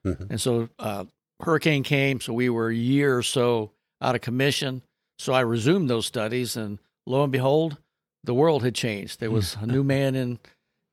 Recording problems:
none

